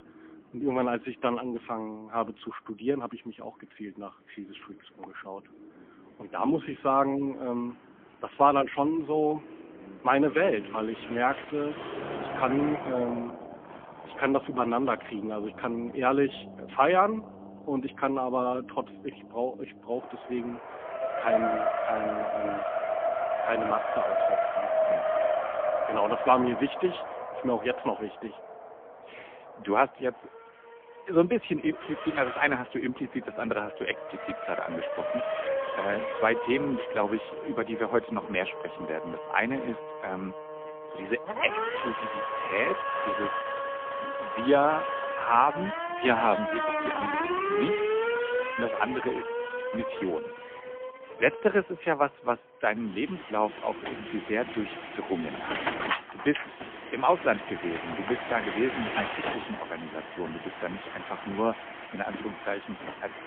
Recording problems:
phone-call audio; poor line; nothing above 3.5 kHz
traffic noise; loud; throughout; 3 dB below the speech

